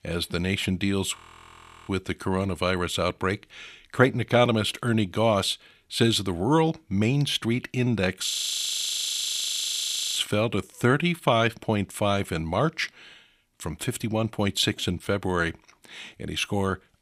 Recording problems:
audio freezing; at 1 s for 0.5 s and at 8.5 s for 2 s

